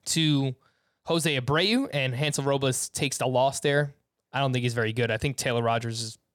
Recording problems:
none

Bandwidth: 18.5 kHz